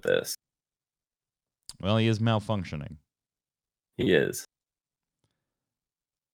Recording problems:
none

